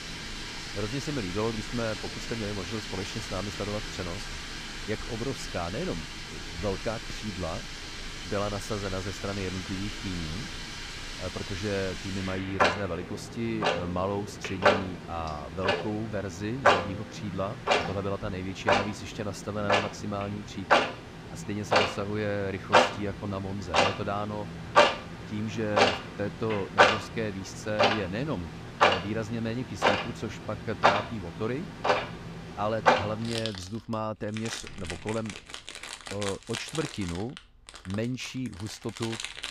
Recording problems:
household noises; very loud; throughout; 5 dB above the speech

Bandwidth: 15.5 kHz